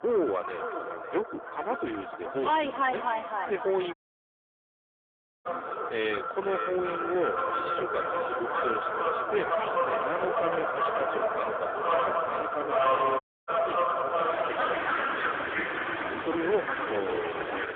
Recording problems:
phone-call audio; poor line; nothing above 3.5 kHz
echo of what is said; noticeable; throughout; 550 ms later, 10 dB below the speech
distortion; slight; 10 dB below the speech
animal sounds; very loud; throughout; 2 dB above the speech
audio cutting out; at 4 s for 1.5 s and at 13 s

